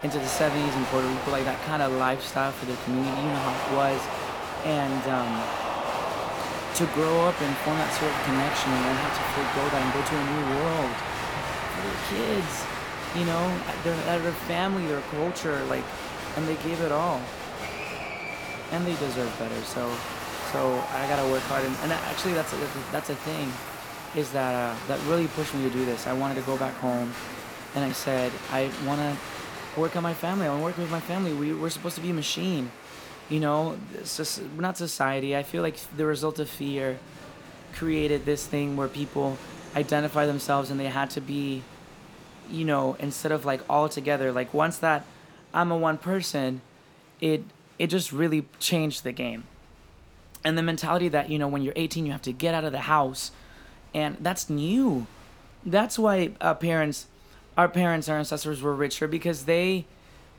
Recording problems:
crowd noise; loud; throughout; 5 dB below the speech

